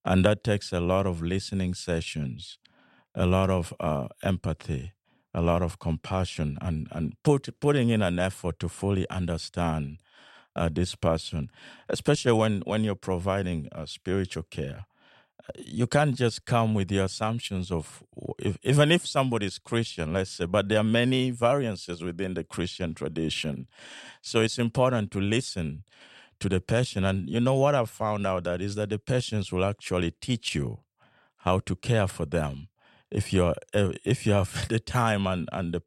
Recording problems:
none

